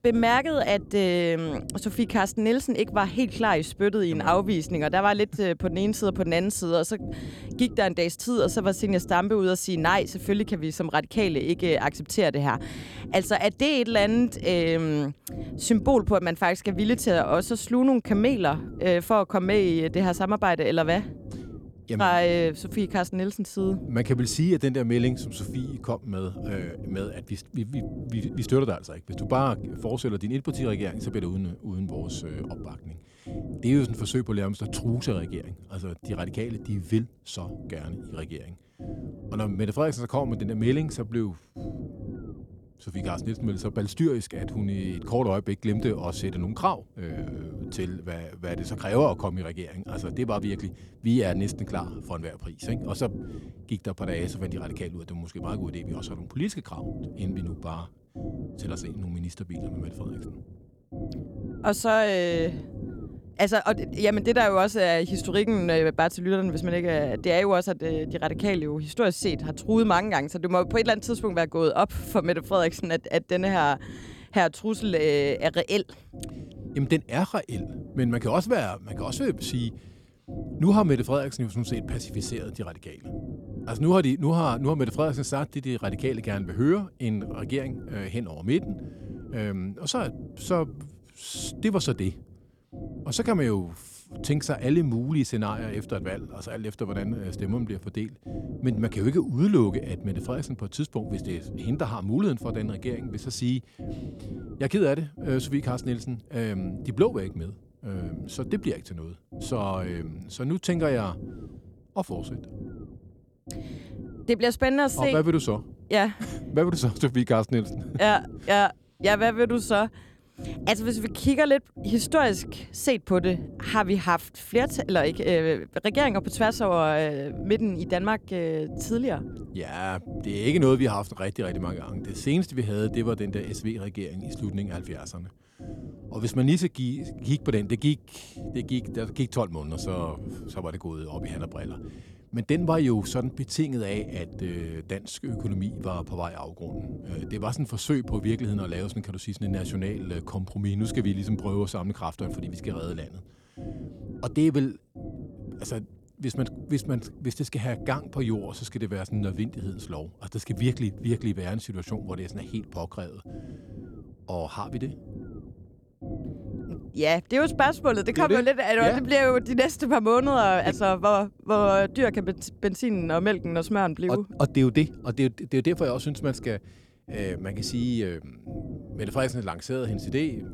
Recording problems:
low rumble; noticeable; throughout; 20 dB below the speech

